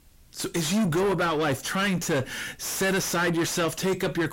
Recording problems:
distortion; heavy; 5 dB below the speech

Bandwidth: 16 kHz